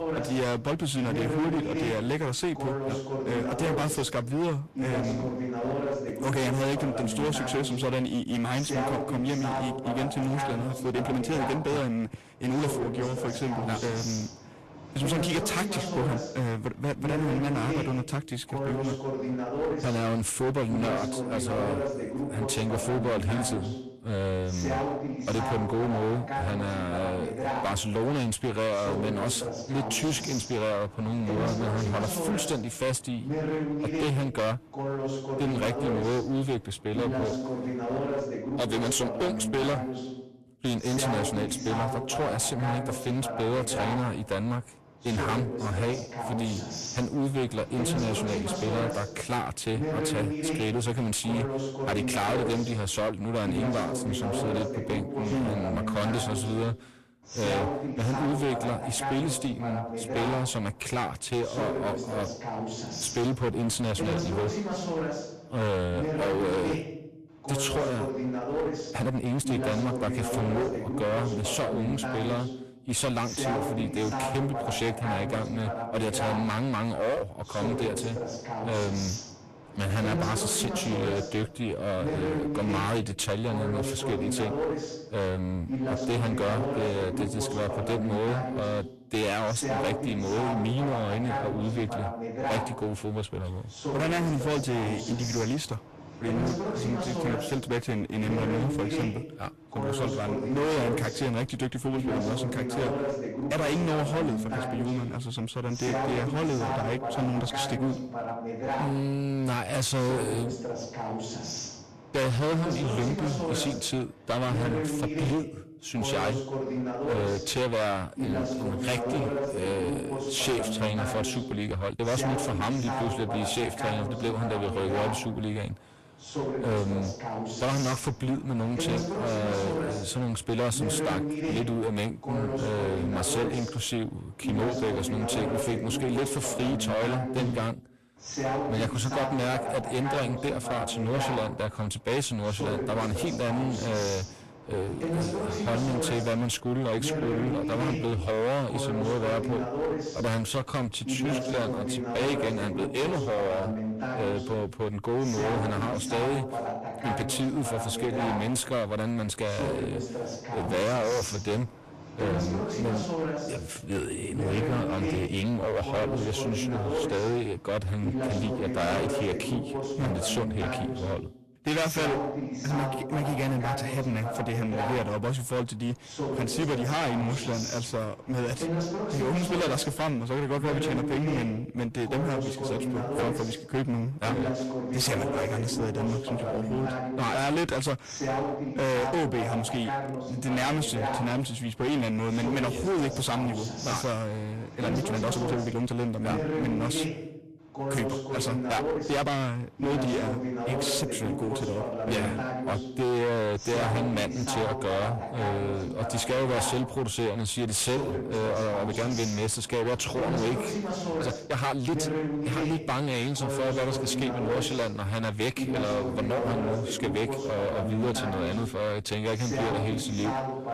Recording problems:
distortion; heavy; 22% of the sound clipped
garbled, watery; slightly; nothing above 12.5 kHz
voice in the background; loud; throughout; 3 dB below the speech
uneven, jittery; strongly; from 11 s to 3:32

